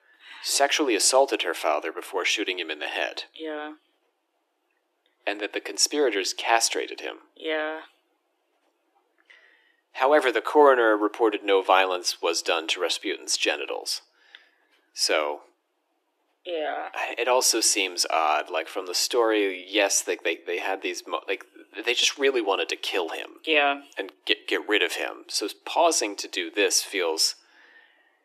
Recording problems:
thin; very; fading below 300 Hz

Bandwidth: 14 kHz